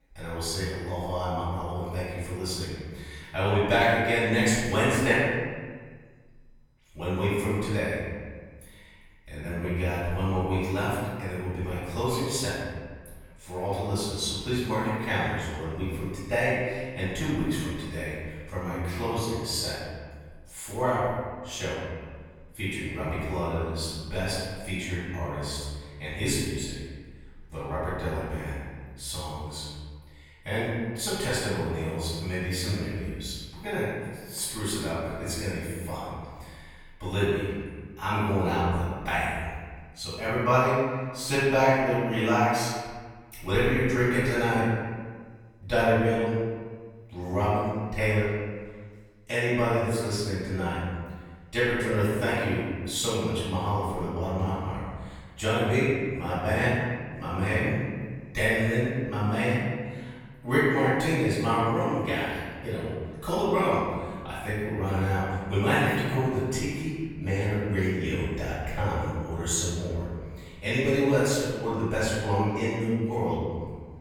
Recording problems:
room echo; strong; dies away in 1.5 s
off-mic speech; far

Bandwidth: 18 kHz